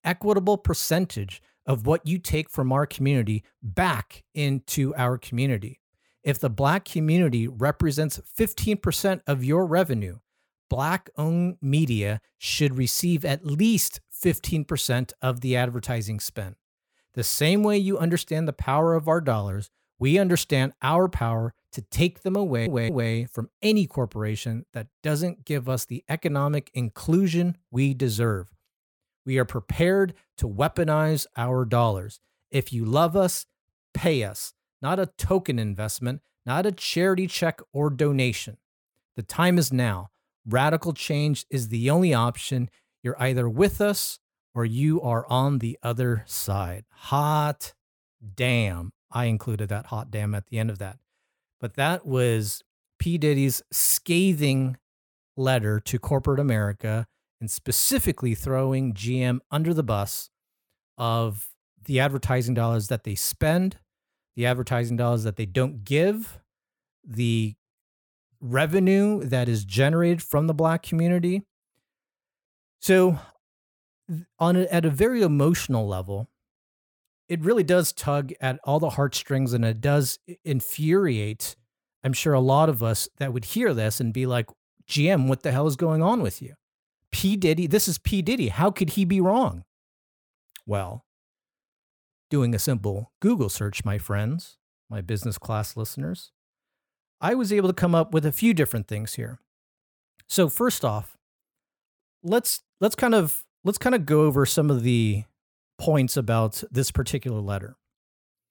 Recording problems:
audio stuttering; at 22 s

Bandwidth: 18.5 kHz